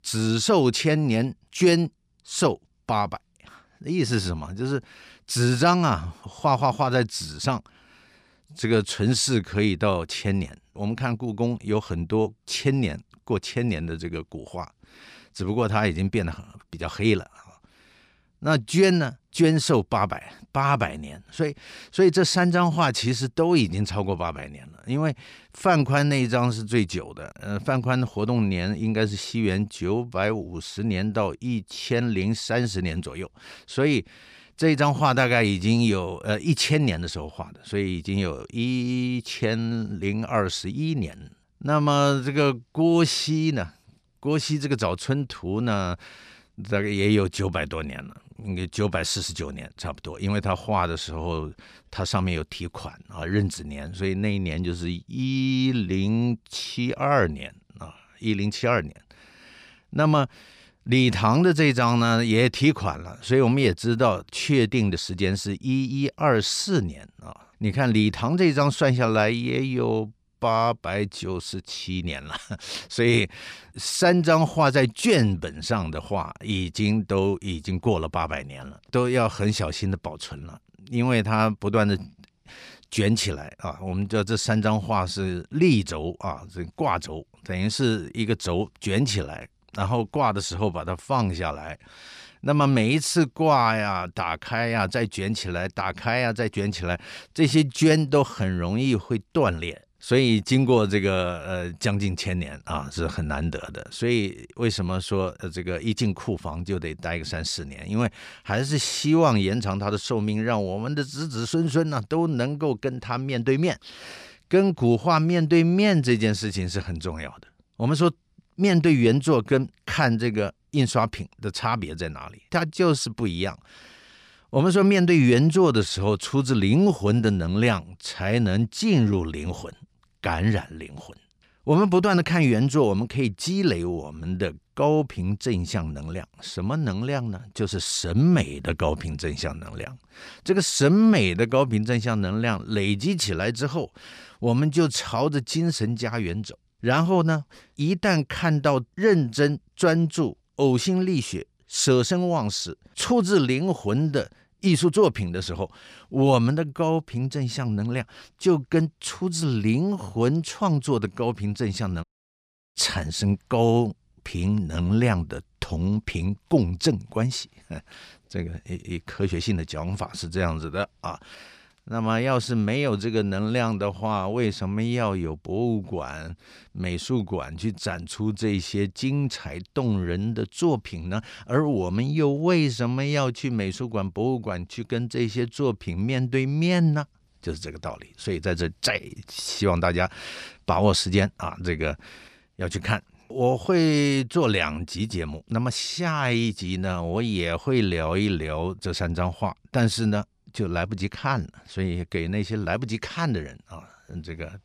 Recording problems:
audio cutting out; at 2:42 for 0.5 s

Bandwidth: 14.5 kHz